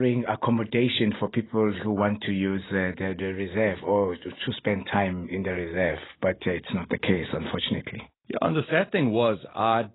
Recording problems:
garbled, watery; badly; nothing above 4 kHz
abrupt cut into speech; at the start

